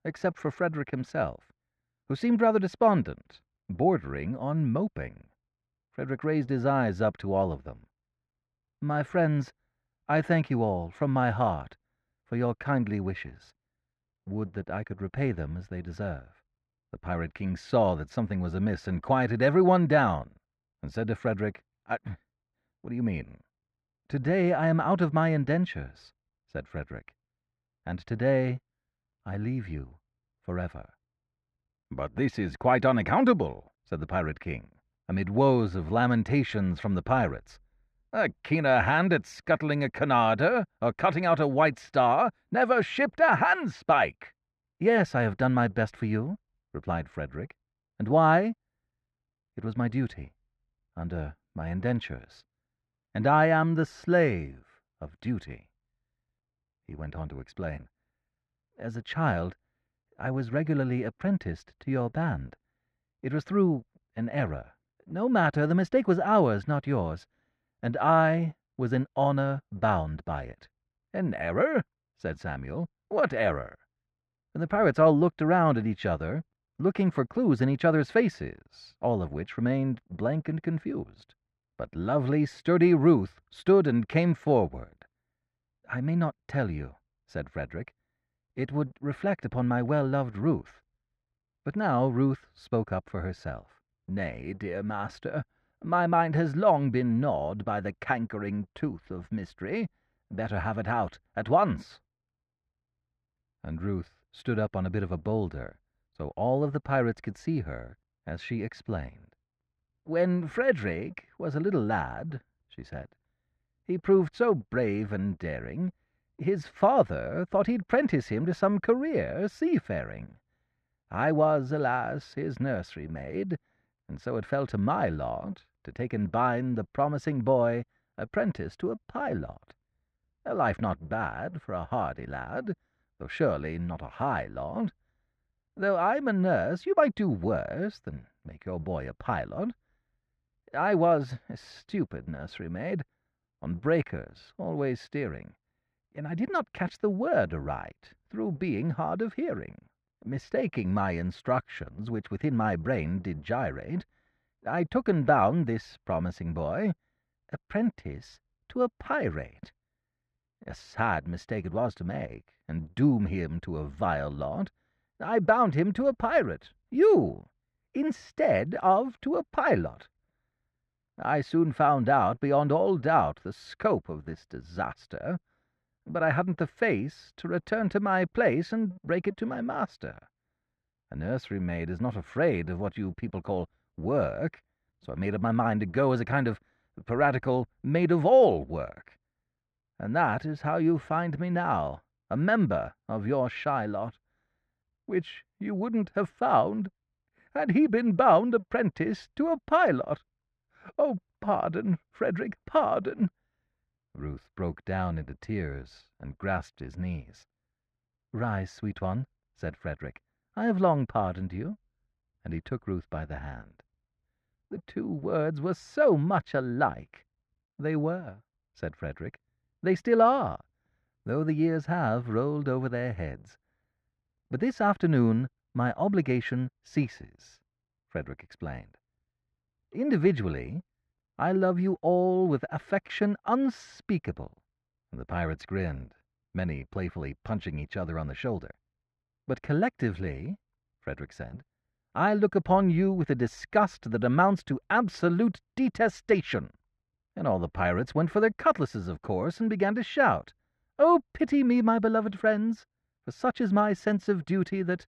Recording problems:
muffled; very; fading above 1.5 kHz

